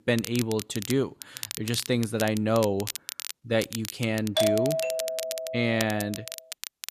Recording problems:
crackle, like an old record; loud; 9 dB below the speech
doorbell; loud; from 4.5 to 6 s; peak 3 dB above the speech

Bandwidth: 14.5 kHz